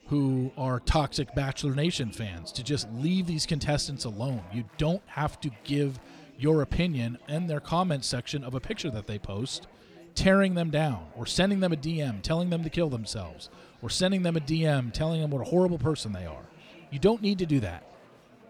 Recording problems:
chatter from many people; faint; throughout; 25 dB below the speech

